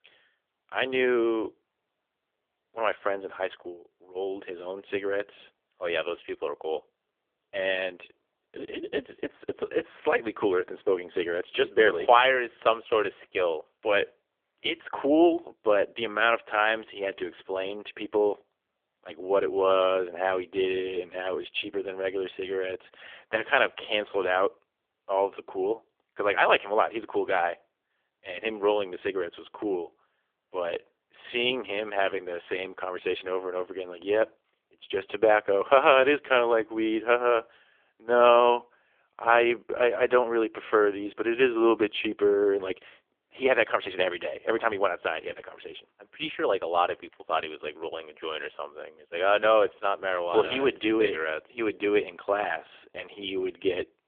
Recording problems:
phone-call audio; poor line; nothing above 3.5 kHz

